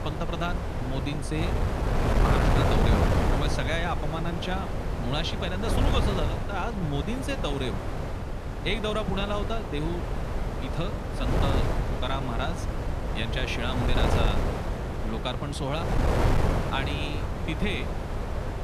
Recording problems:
wind noise on the microphone; heavy; as loud as the speech

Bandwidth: 14 kHz